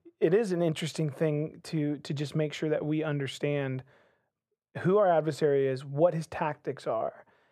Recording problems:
muffled; very; fading above 2.5 kHz

